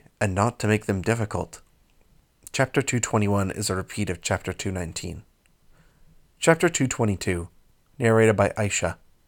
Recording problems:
none

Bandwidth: 18 kHz